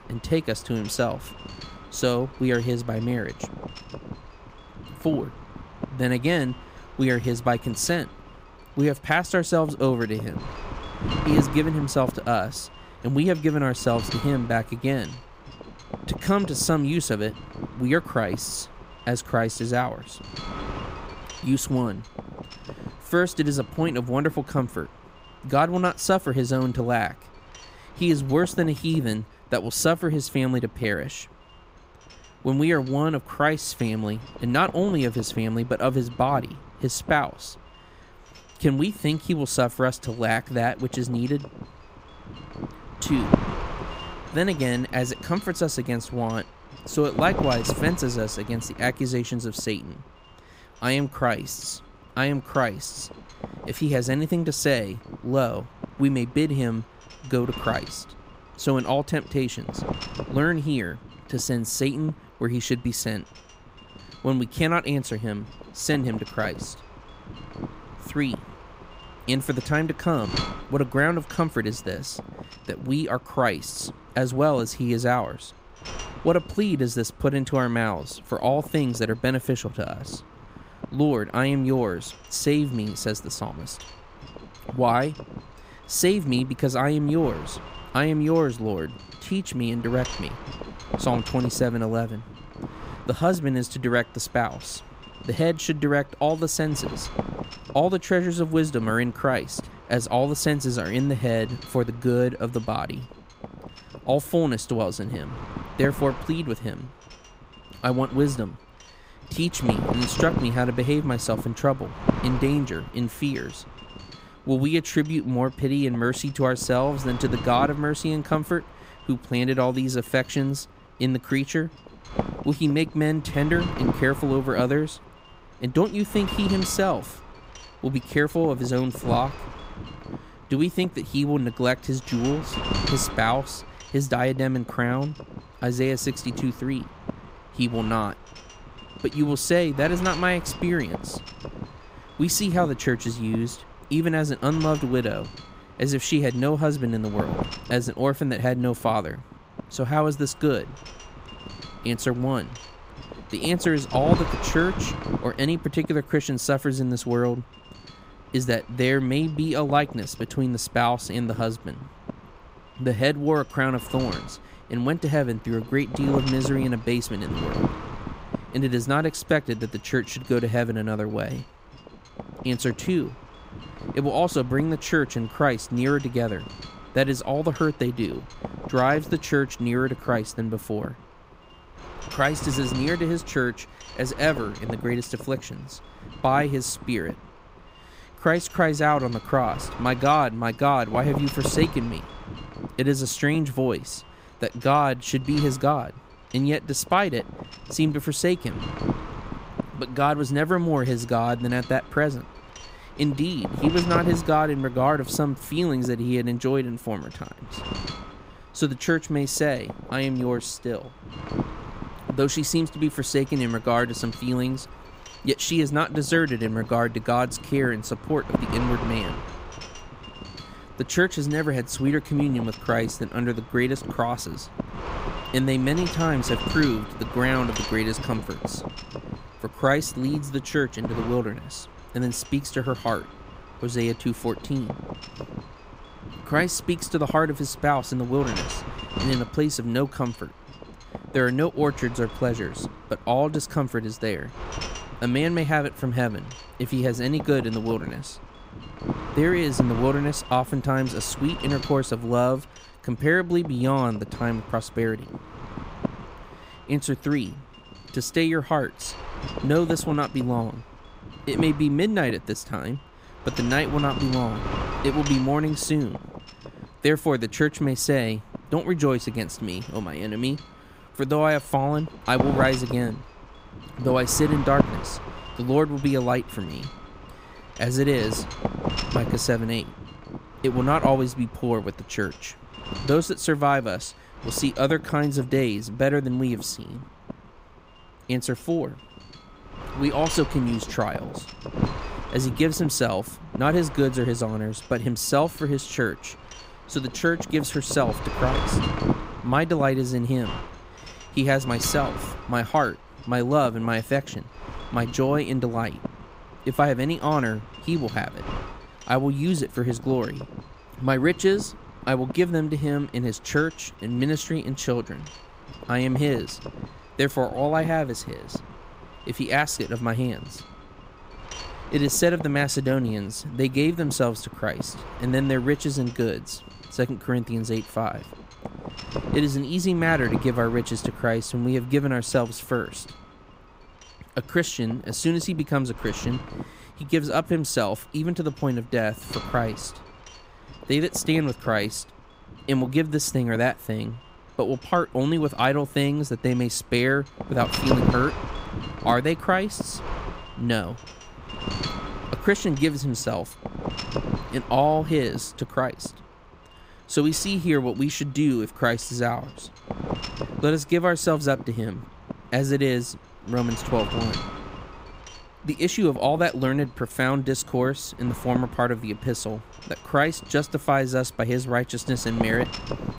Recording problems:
wind noise on the microphone; occasional gusts; 10 dB below the speech

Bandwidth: 15.5 kHz